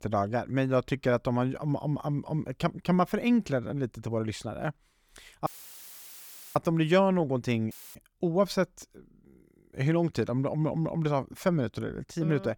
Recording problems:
audio cutting out; filled with static; at 5.5 s for 1 s and at 7.5 s

